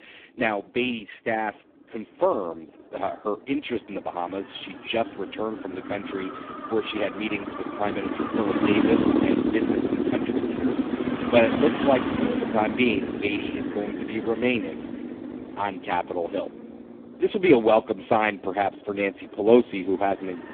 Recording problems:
phone-call audio; poor line
traffic noise; loud; throughout; 1 dB below the speech

